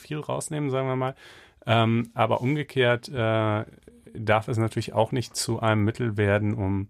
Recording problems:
none

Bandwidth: 14.5 kHz